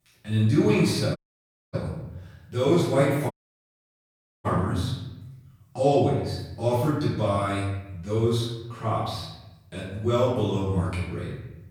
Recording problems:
off-mic speech; far
room echo; noticeable; dies away in 0.9 s
audio cutting out; at 1 s for 0.5 s and at 3.5 s for 1 s

